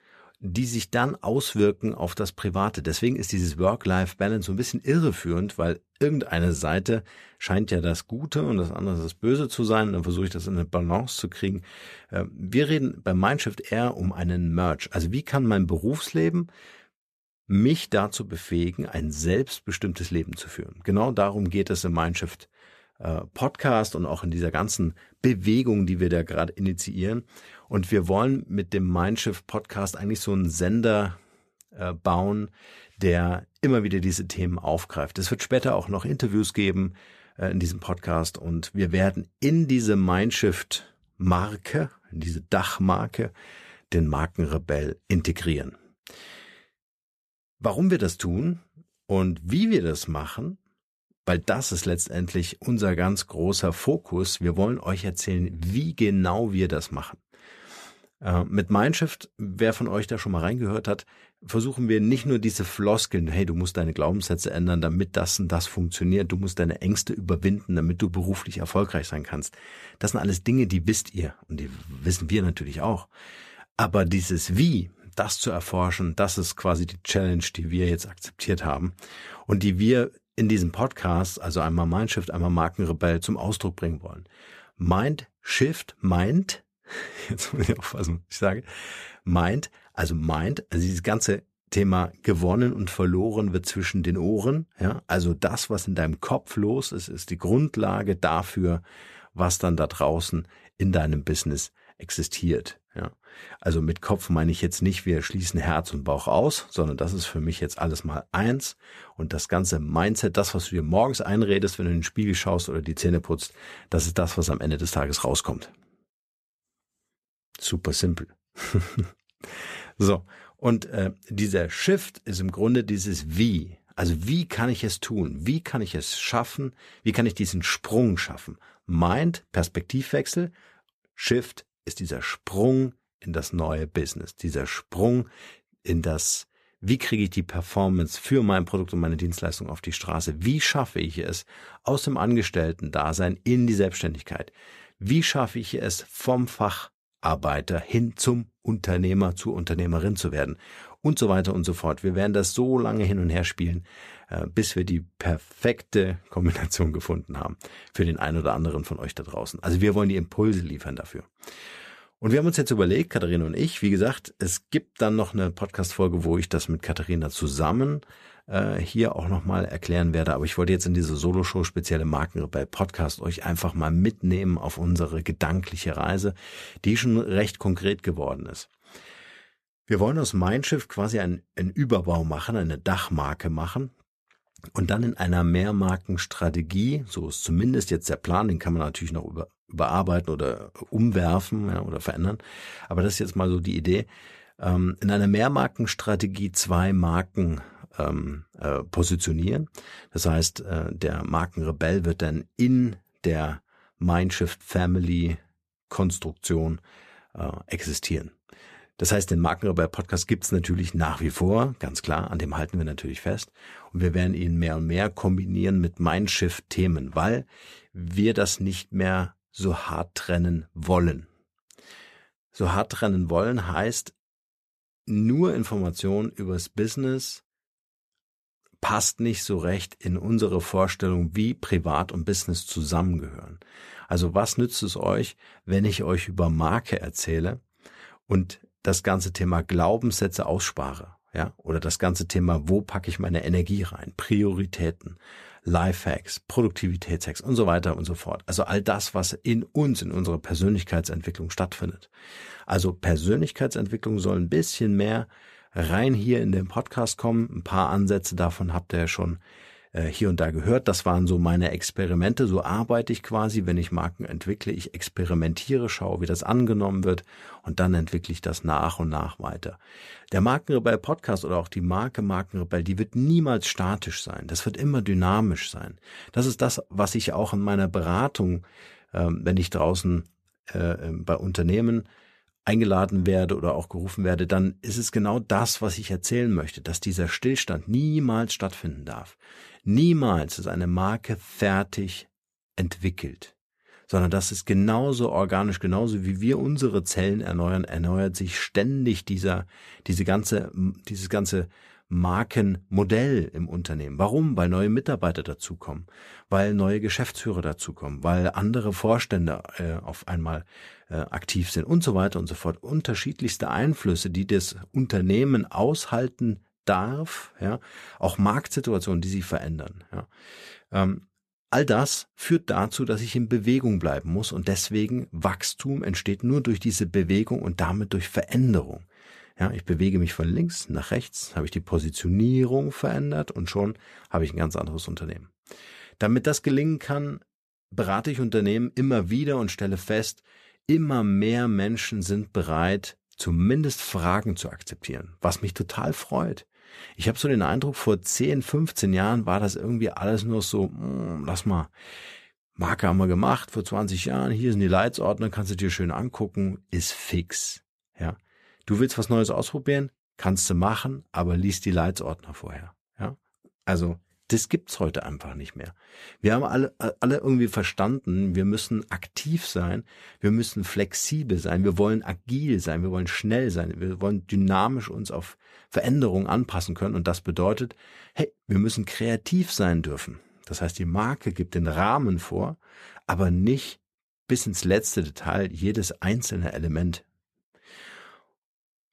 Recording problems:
none

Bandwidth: 14.5 kHz